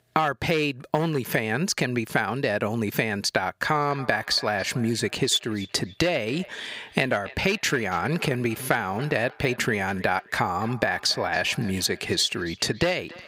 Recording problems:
echo of what is said; faint; from 3.5 s on; 280 ms later, 20 dB below the speech
thin; very slightly; fading below 450 Hz
squashed, flat; somewhat

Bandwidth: 15.5 kHz